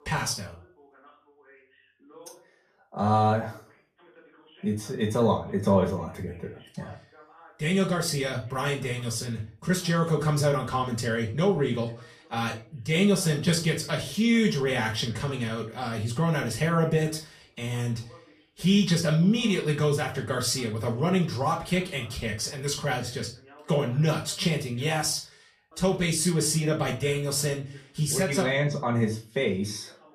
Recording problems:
off-mic speech; far
room echo; very slight; dies away in 0.3 s
voice in the background; faint; throughout; 25 dB below the speech

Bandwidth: 14.5 kHz